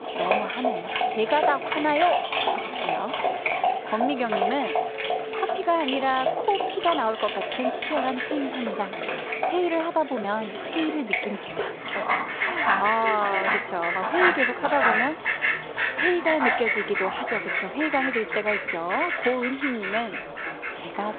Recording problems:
phone-call audio
animal sounds; very loud; throughout; 1 dB above the speech
alarms or sirens; noticeable; until 16 s; 15 dB below the speech
chatter from many people; noticeable; throughout; 10 dB below the speech
uneven, jittery; slightly; from 3.5 to 19 s

